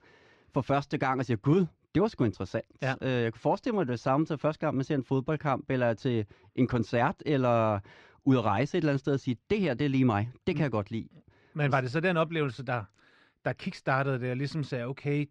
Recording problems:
muffled; slightly; fading above 2.5 kHz

